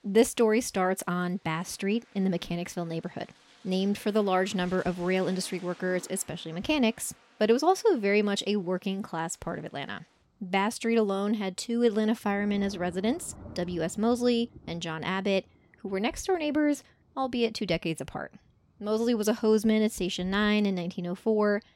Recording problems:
rain or running water; faint; throughout; 25 dB below the speech

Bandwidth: 16 kHz